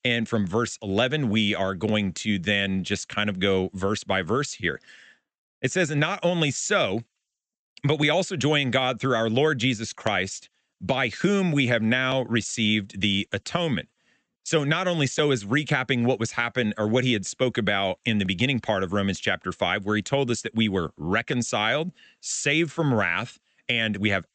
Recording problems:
high frequencies cut off; noticeable; nothing above 8 kHz

